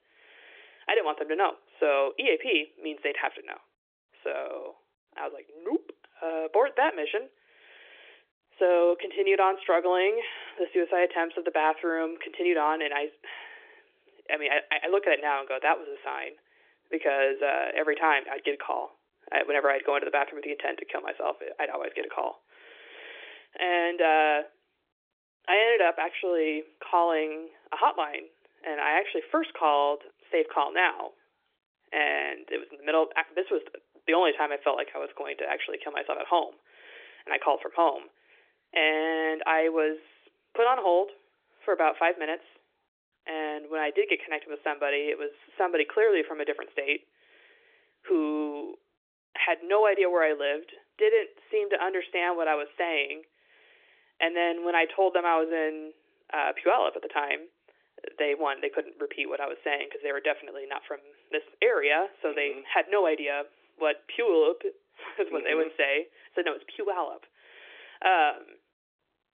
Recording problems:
phone-call audio; nothing above 3 kHz

